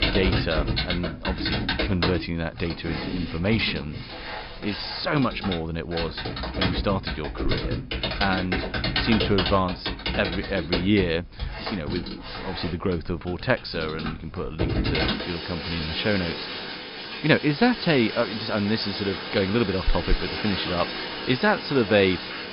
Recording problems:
high frequencies cut off; noticeable; nothing above 5.5 kHz
household noises; loud; throughout; 3 dB below the speech

